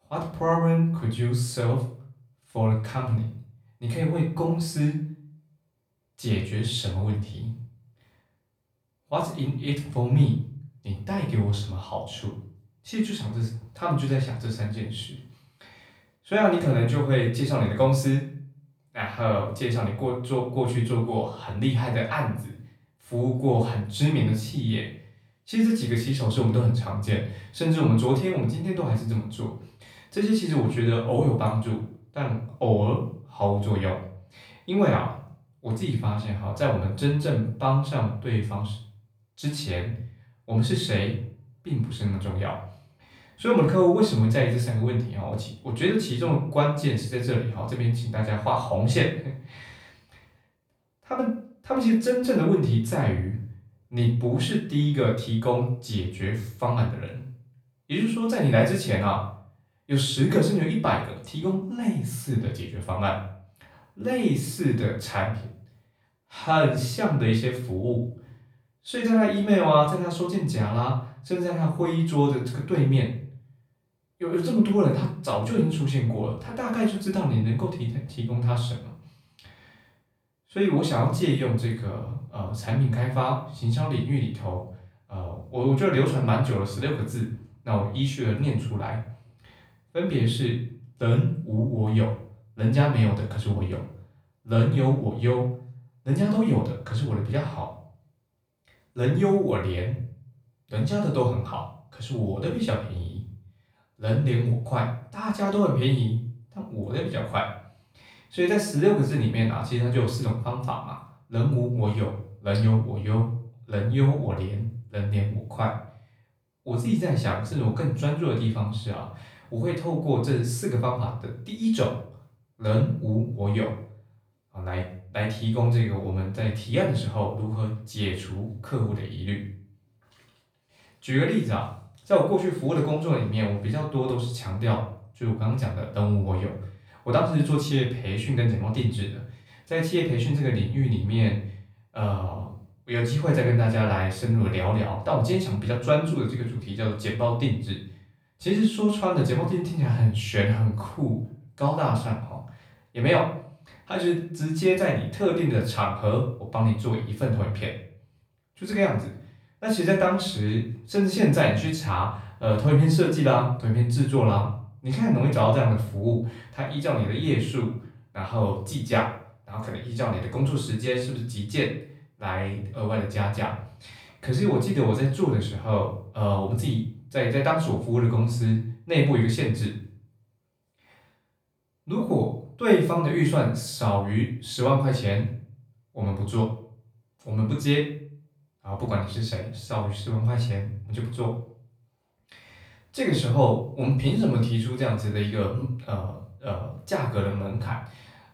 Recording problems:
off-mic speech; far
room echo; slight; dies away in 0.4 s

